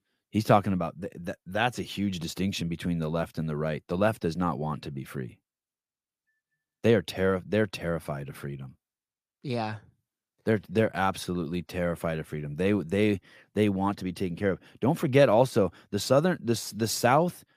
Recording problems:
none

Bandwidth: 15 kHz